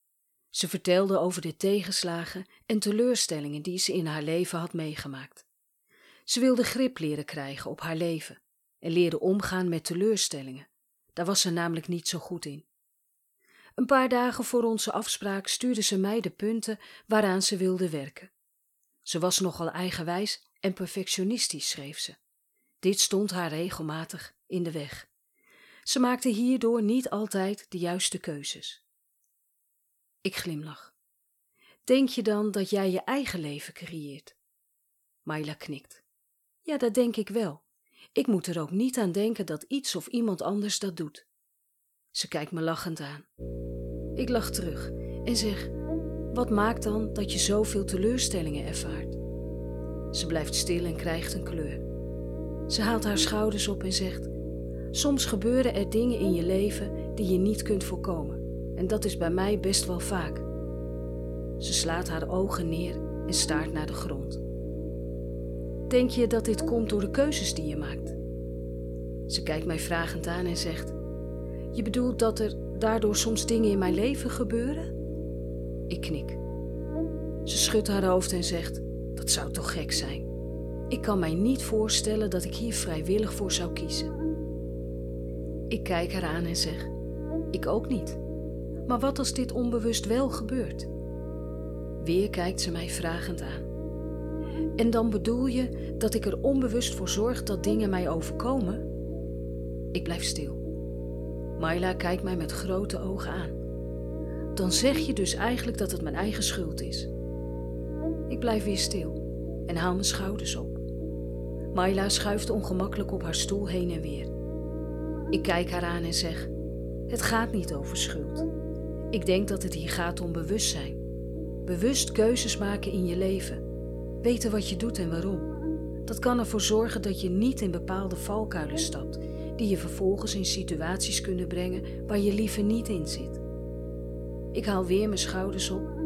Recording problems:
electrical hum; loud; from 43 s on; 60 Hz, 9 dB below the speech

